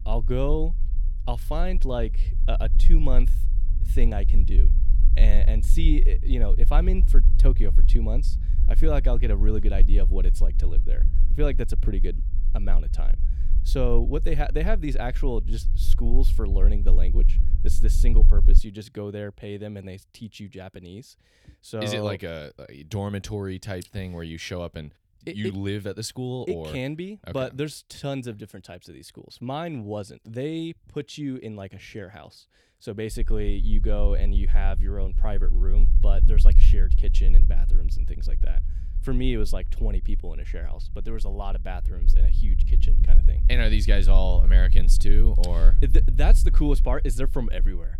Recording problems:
low rumble; noticeable; until 19 s and from 33 s on; 15 dB below the speech

